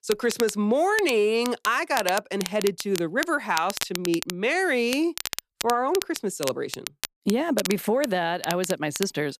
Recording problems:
crackle, like an old record; loud; 9 dB below the speech

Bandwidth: 14.5 kHz